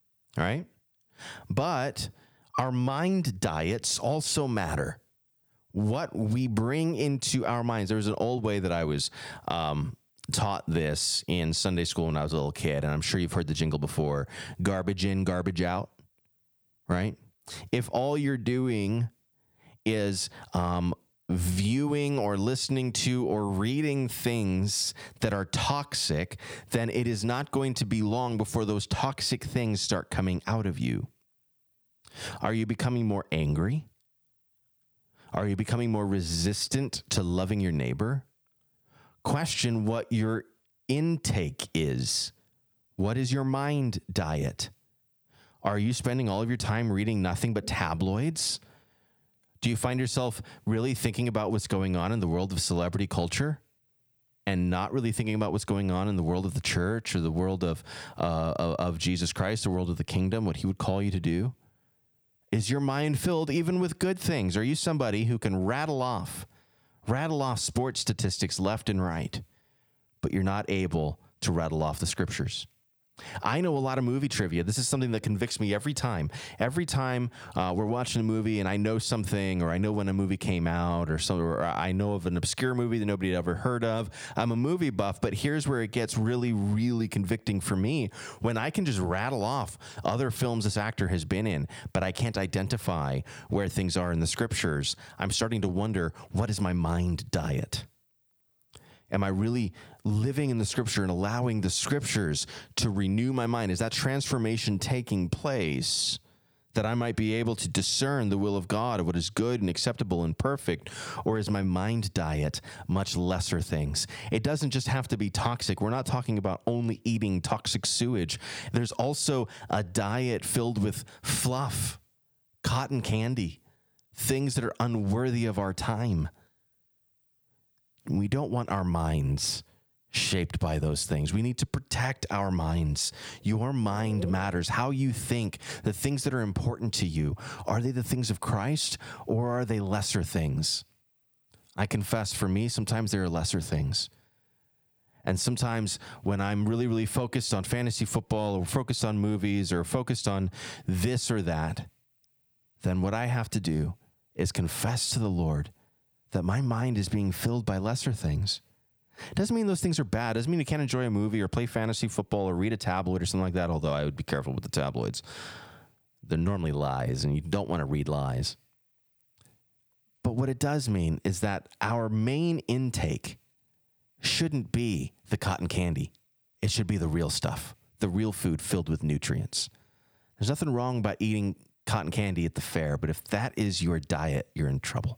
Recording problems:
squashed, flat; somewhat

